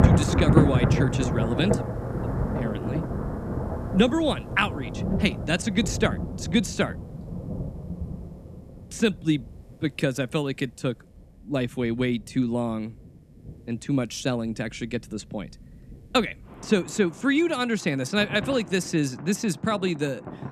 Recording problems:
rain or running water; loud; throughout; 2 dB below the speech

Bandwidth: 14 kHz